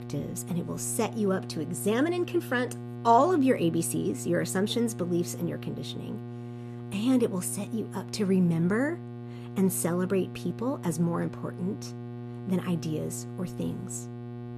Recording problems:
electrical hum; noticeable; throughout; 60 Hz, 15 dB below the speech

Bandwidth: 14.5 kHz